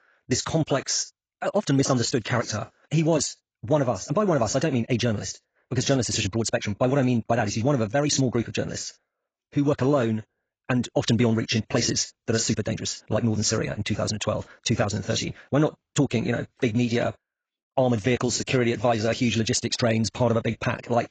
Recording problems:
garbled, watery; badly; nothing above 7.5 kHz
wrong speed, natural pitch; too fast; 1.7 times normal speed

